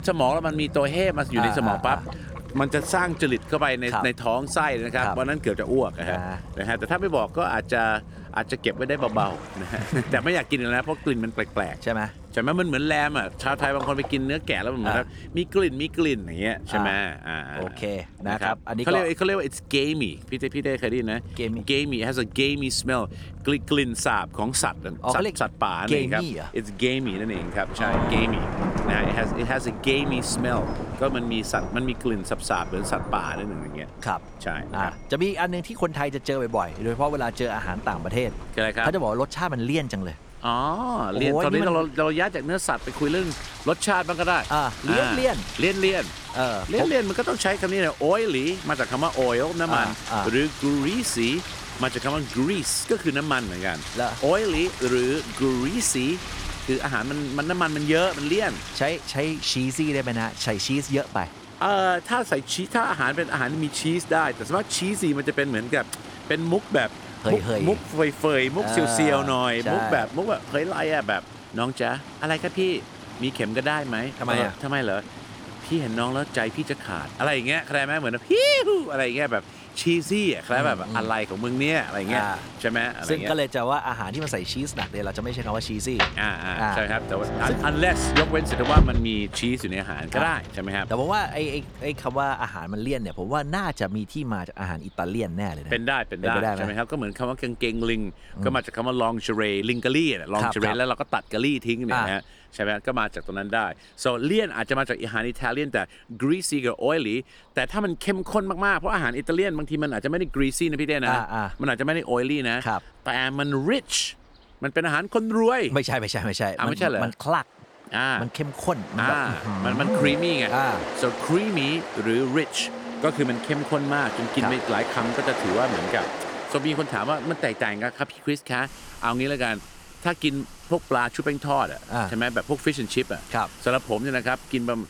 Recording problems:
rain or running water; loud; throughout; 10 dB below the speech

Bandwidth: 18.5 kHz